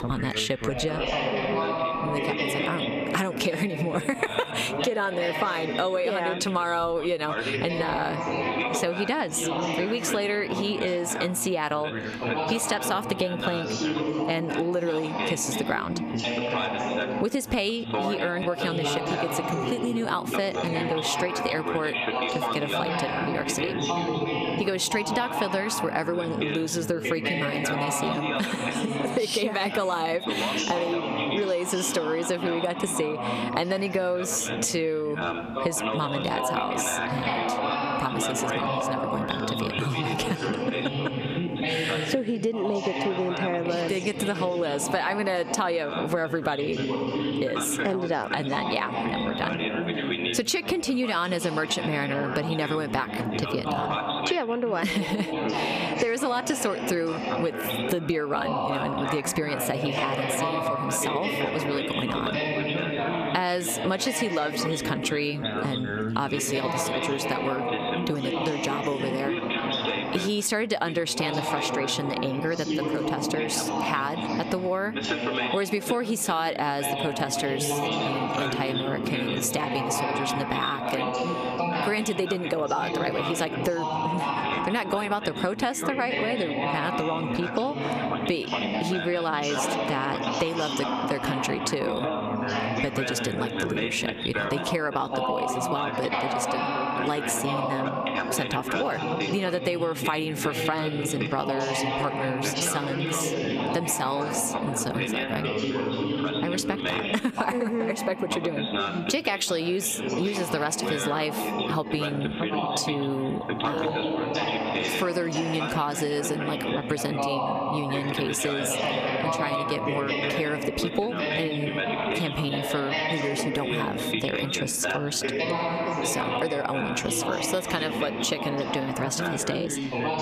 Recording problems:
squashed, flat; somewhat
background chatter; loud; throughout; 3 voices, 1 dB below the speech

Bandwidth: 14.5 kHz